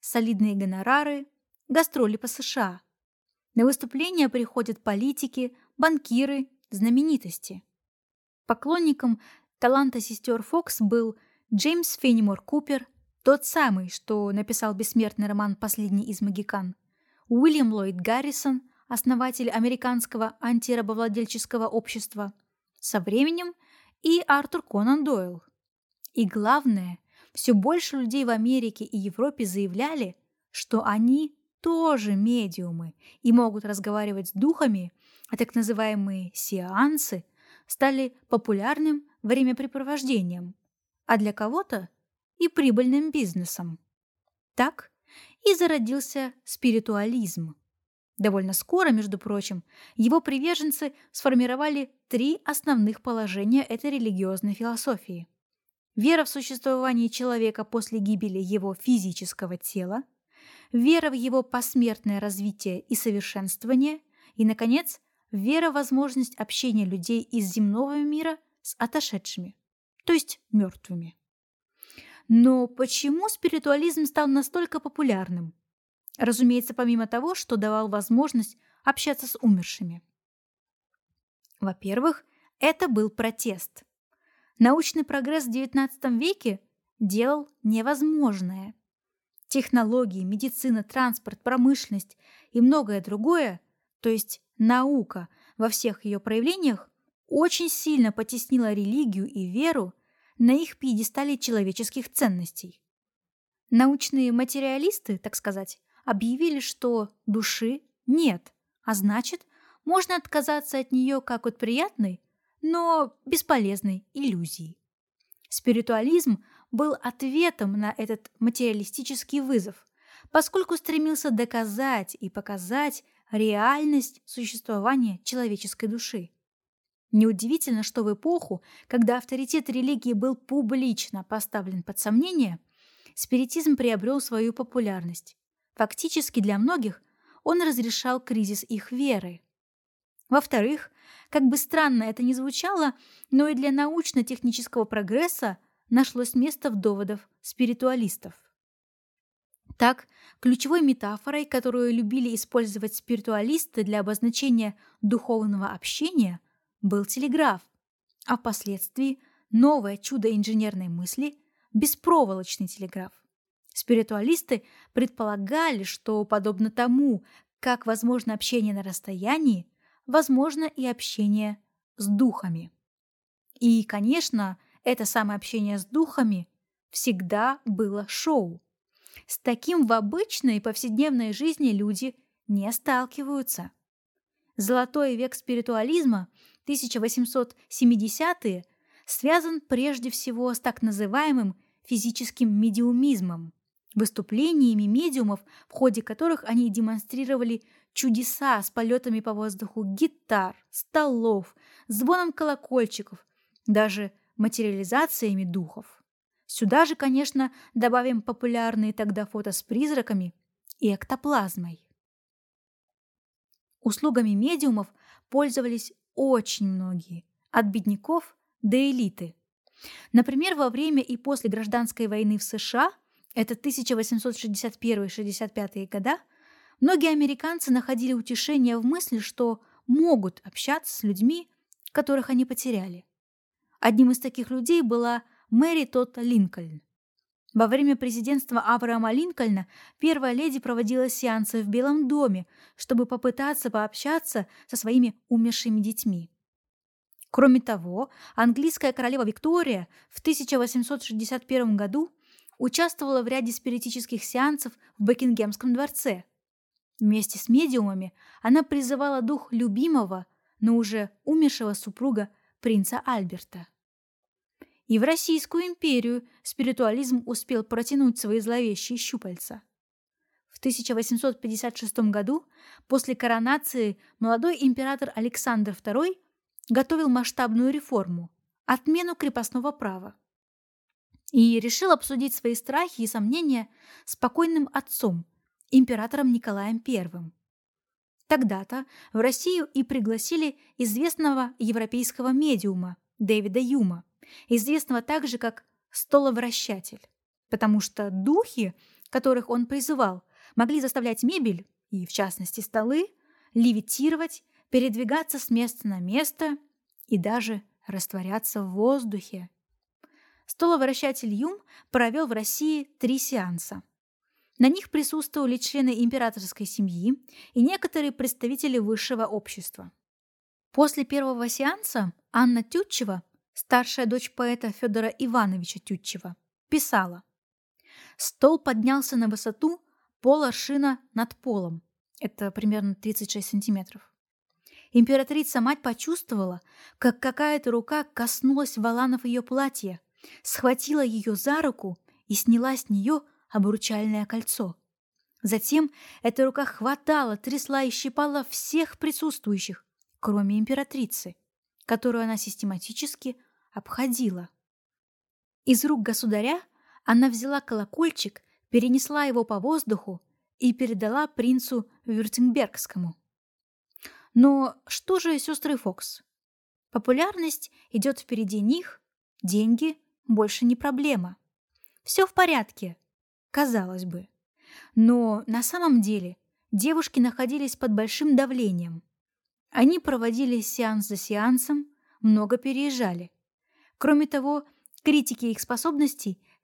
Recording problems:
uneven, jittery; strongly; from 1:12 to 6:21

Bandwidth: 18 kHz